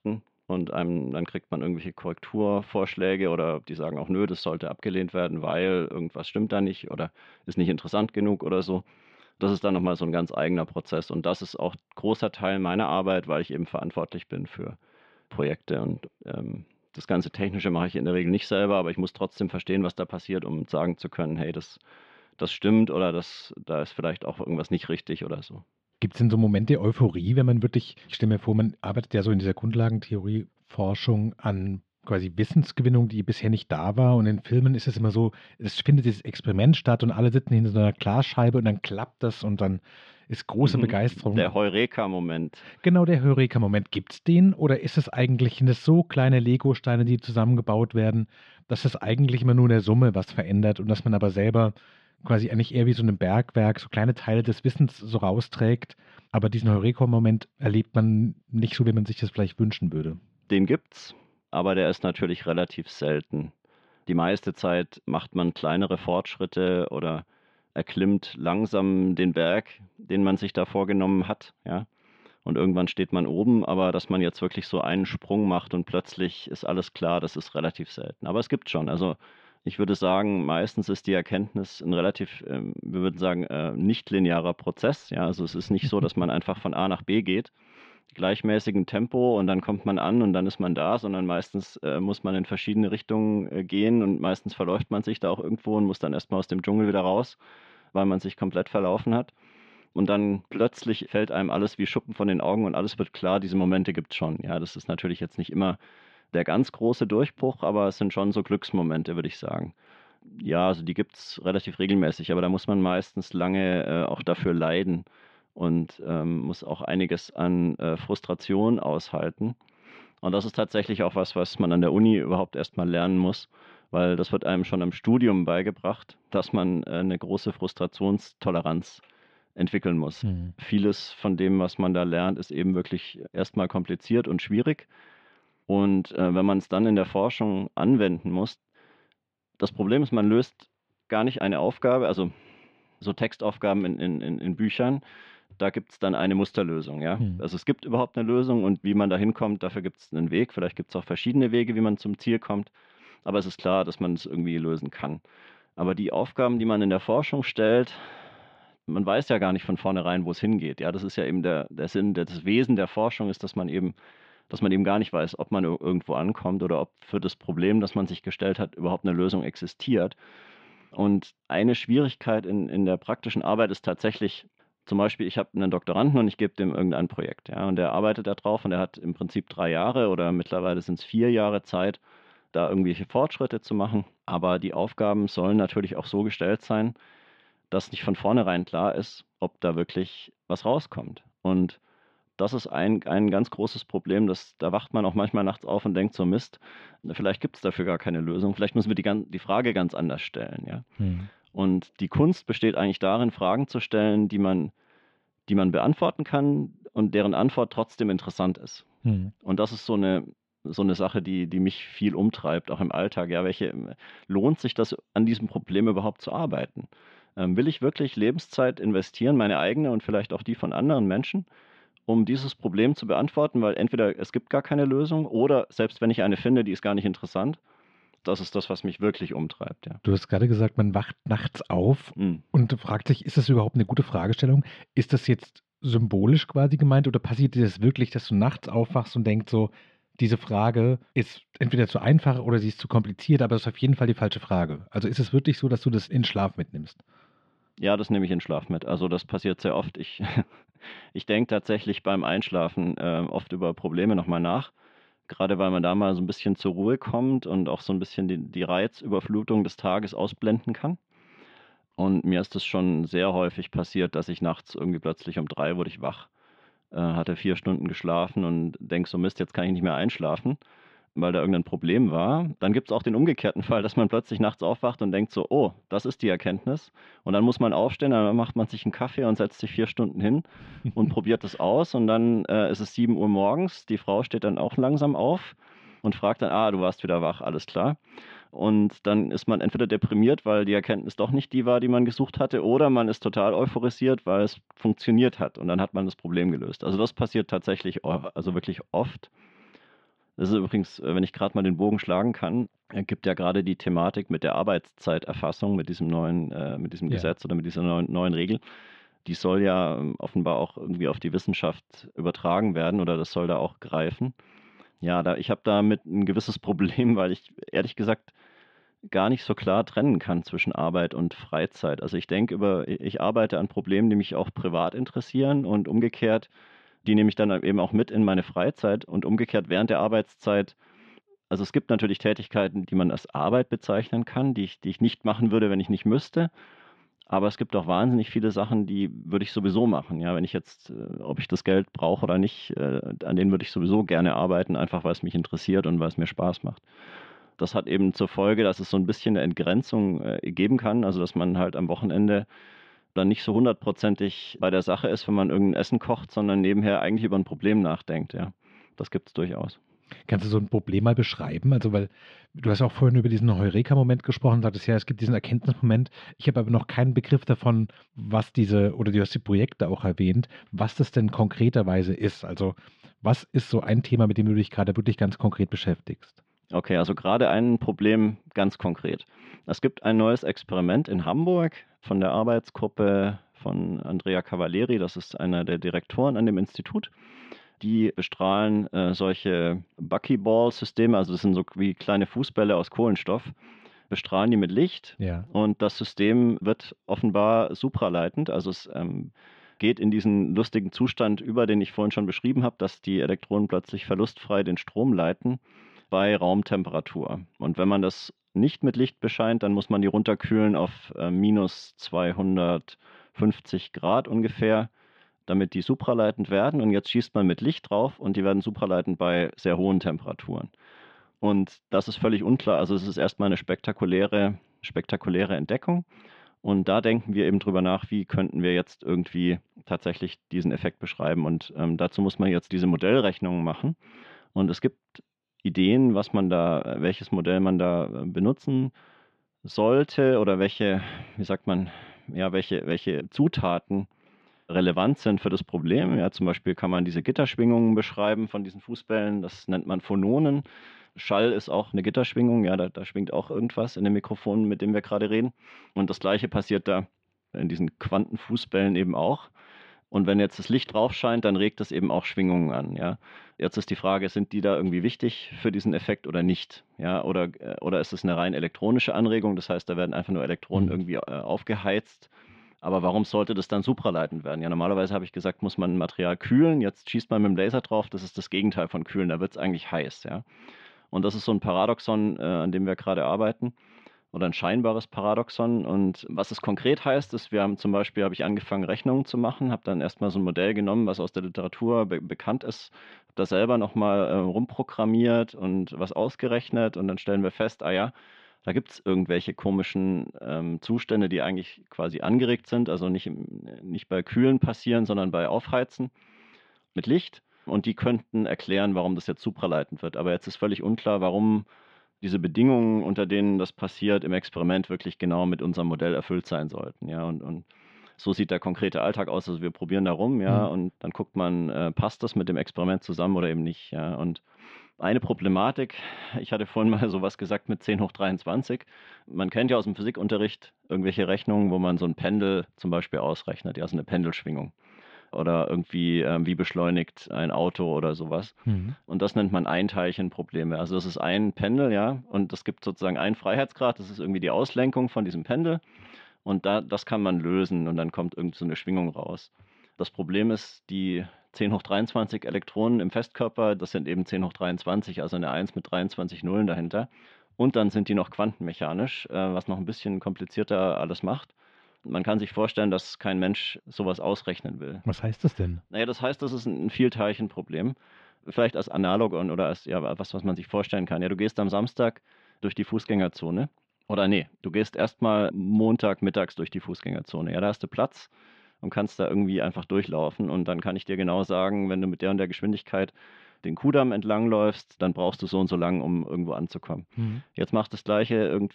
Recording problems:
muffled; slightly; fading above 3.5 kHz

